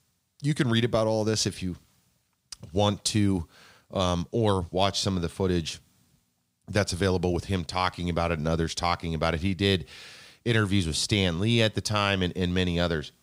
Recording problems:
none

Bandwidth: 15.5 kHz